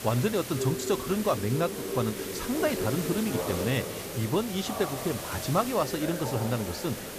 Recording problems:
background chatter; loud; throughout; 4 voices, 7 dB below the speech
hiss; loud; throughout; 8 dB below the speech

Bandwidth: 14.5 kHz